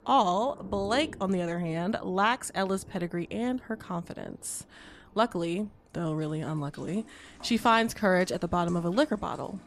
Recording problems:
rain or running water; faint; throughout; 20 dB below the speech

